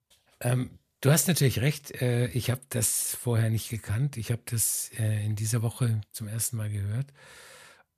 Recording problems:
none

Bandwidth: 14.5 kHz